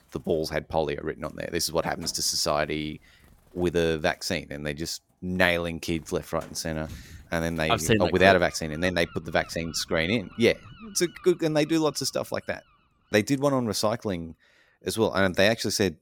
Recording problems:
animal sounds; faint; throughout; 25 dB below the speech

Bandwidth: 17 kHz